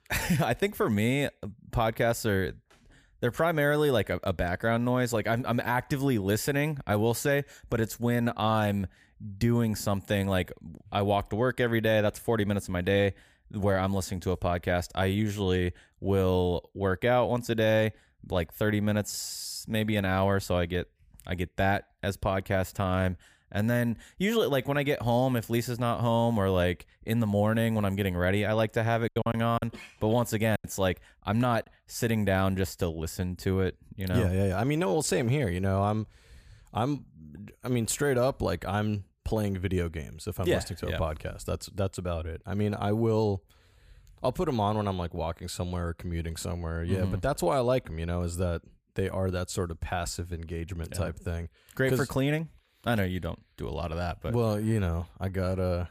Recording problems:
choppy; very; from 29 to 31 s; 10% of the speech affected

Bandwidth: 15 kHz